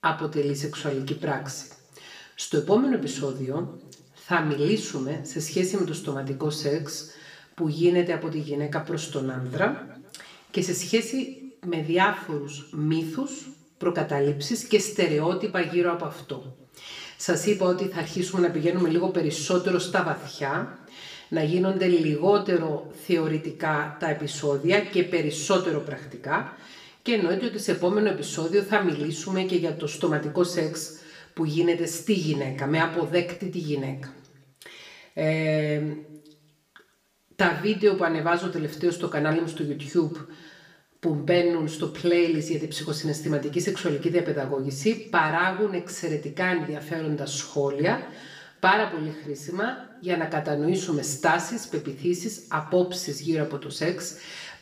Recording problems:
room echo; slight; dies away in 0.6 s
off-mic speech; somewhat distant

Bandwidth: 15 kHz